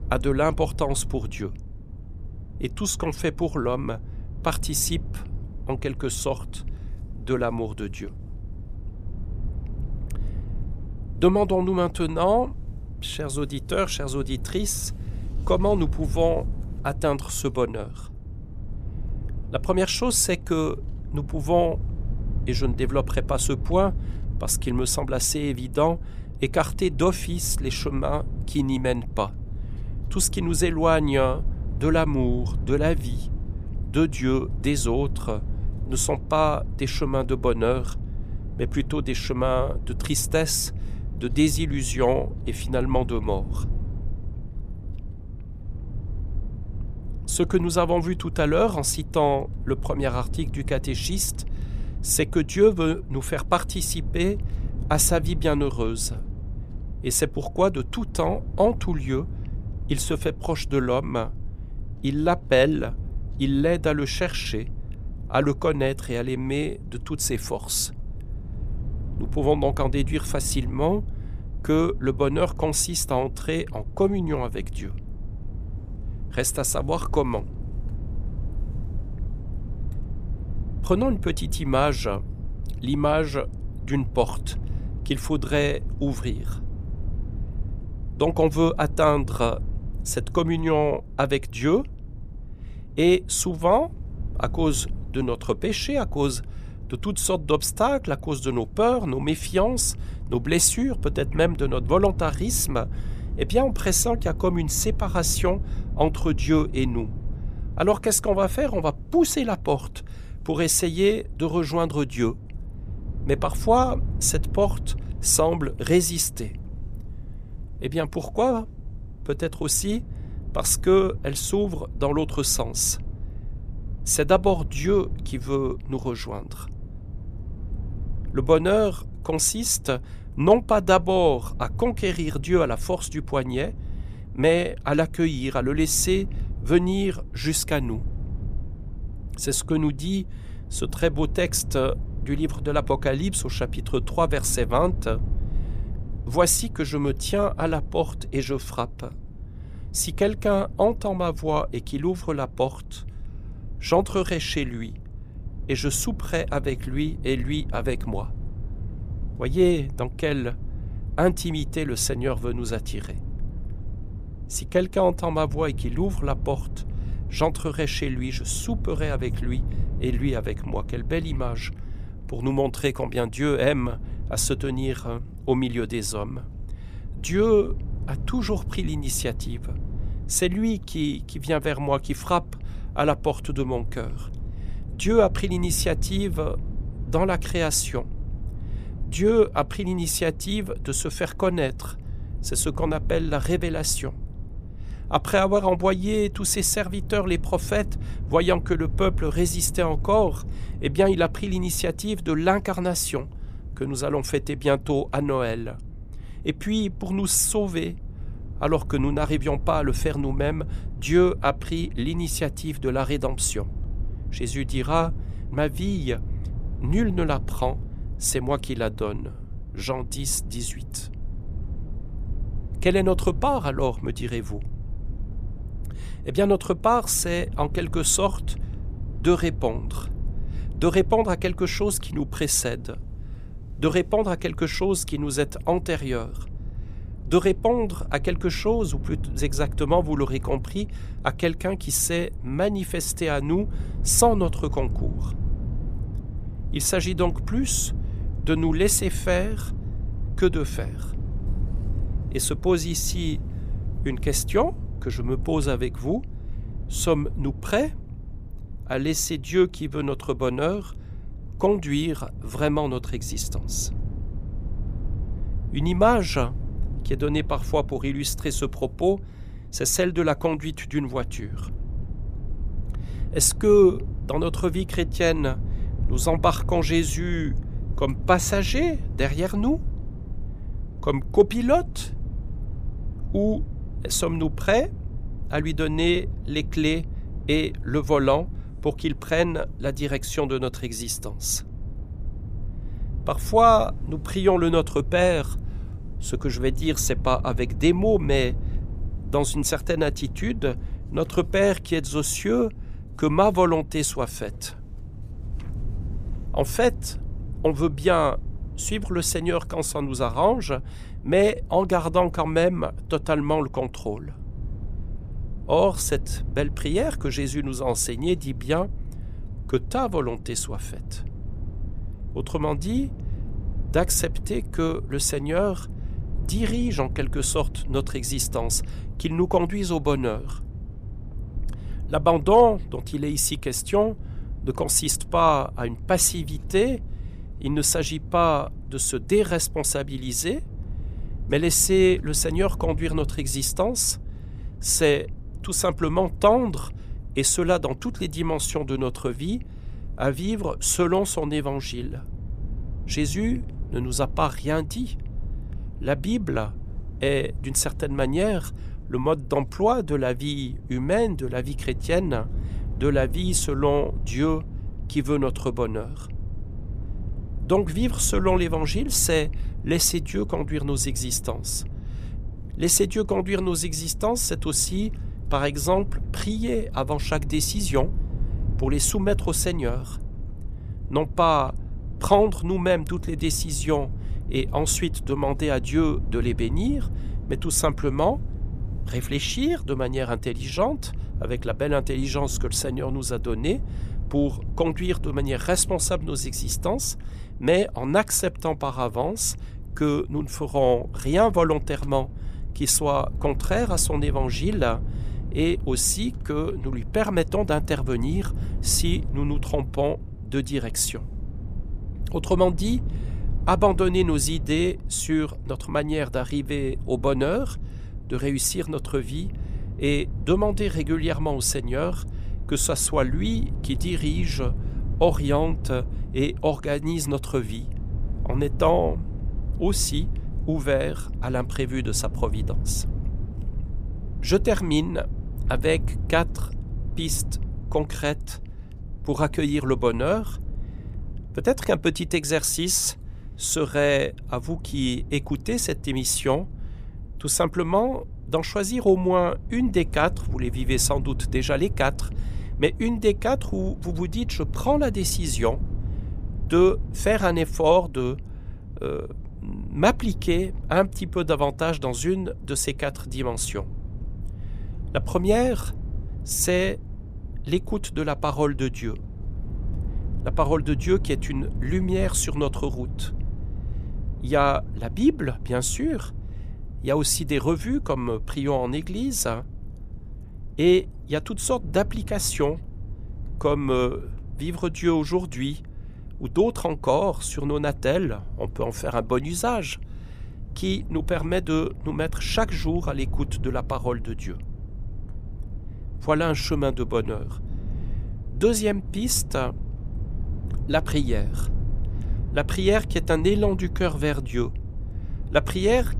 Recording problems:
low rumble; faint; throughout; 20 dB below the speech

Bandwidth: 15 kHz